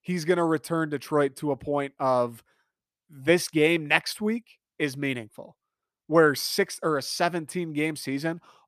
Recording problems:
none

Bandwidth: 14.5 kHz